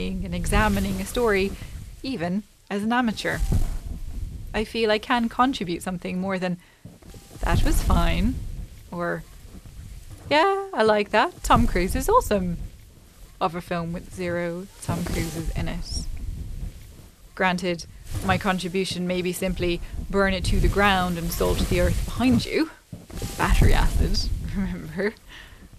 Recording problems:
wind noise on the microphone; occasional gusts; 15 dB below the speech
abrupt cut into speech; at the start

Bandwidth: 14.5 kHz